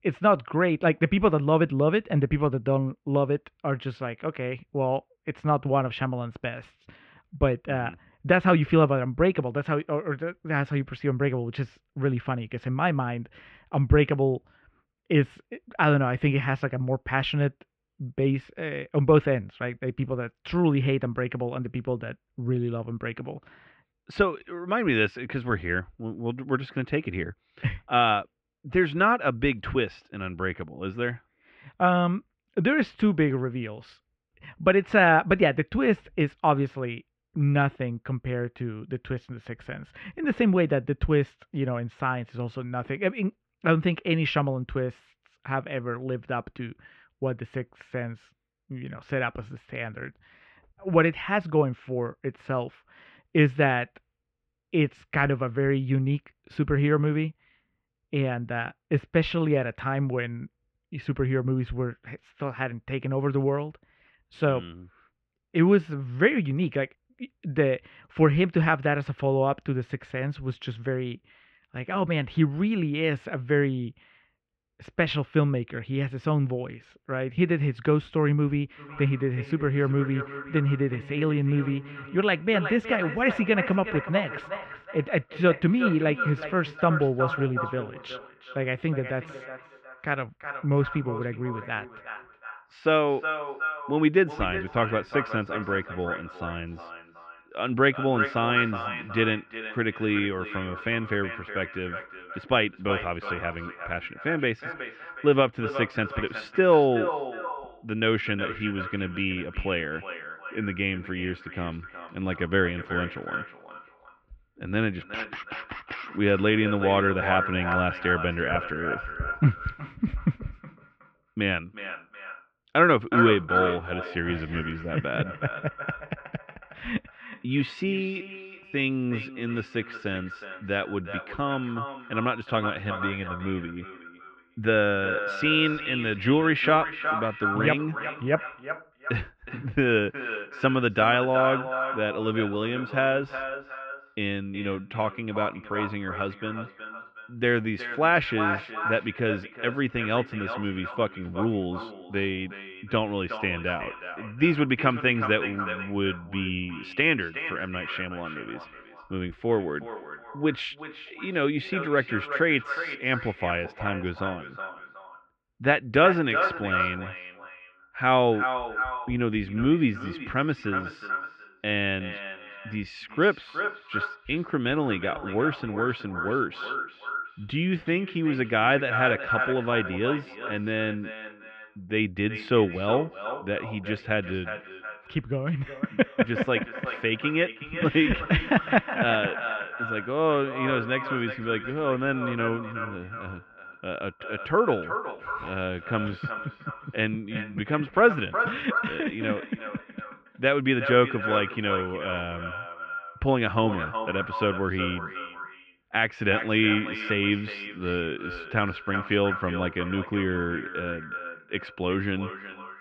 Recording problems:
echo of what is said; strong; from 1:19 on; 370 ms later, 8 dB below the speech
muffled; very; fading above 2.5 kHz

